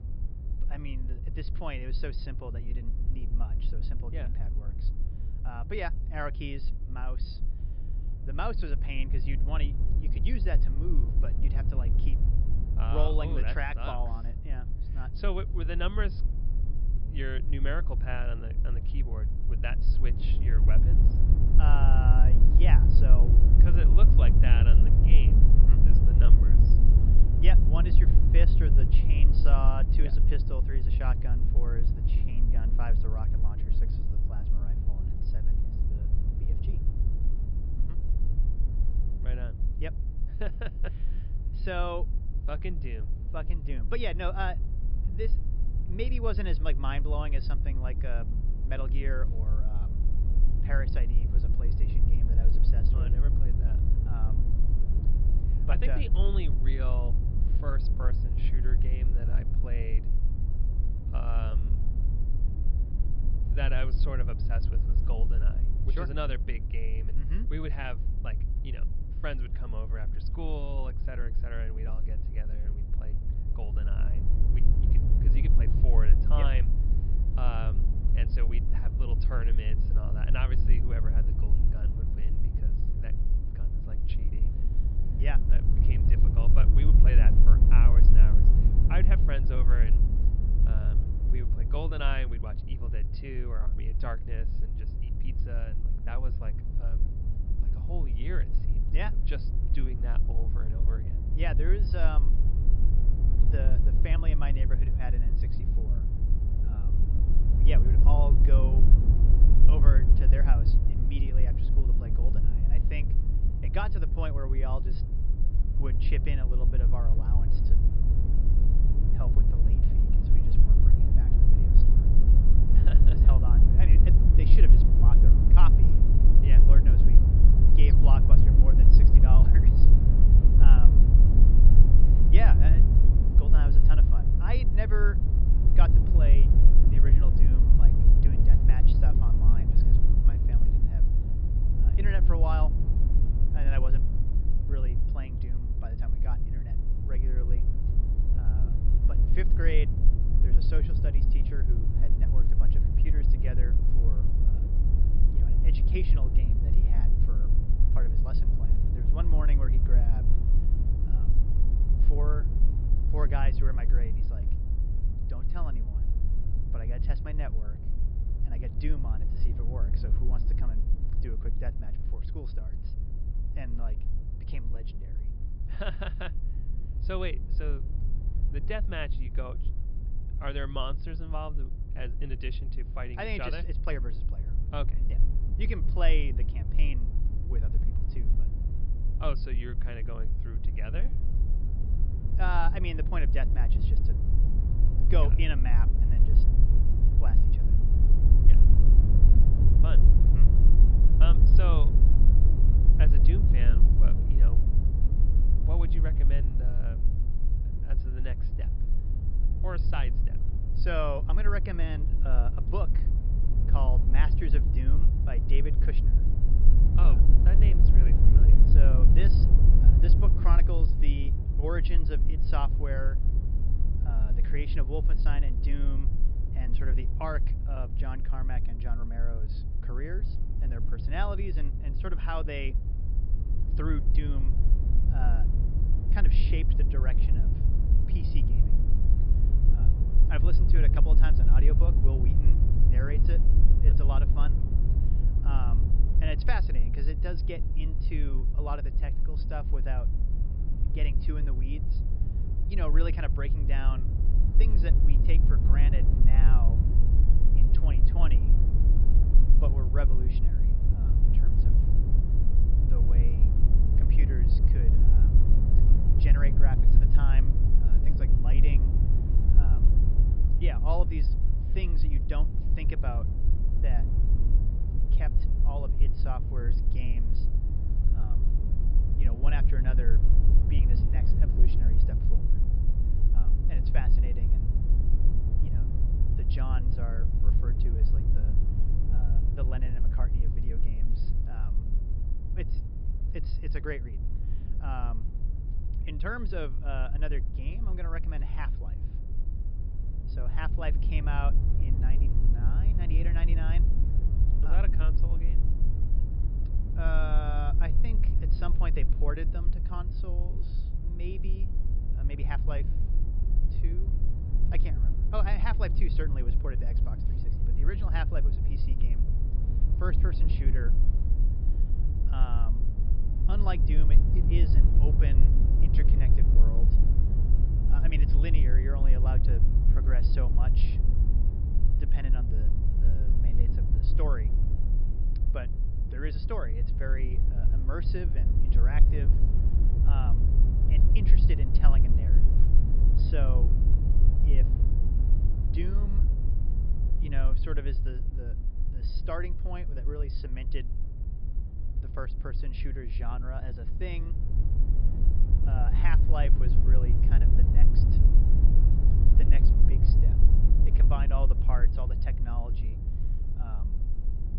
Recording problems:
high frequencies cut off; noticeable; nothing above 5.5 kHz
low rumble; loud; throughout; 4 dB below the speech

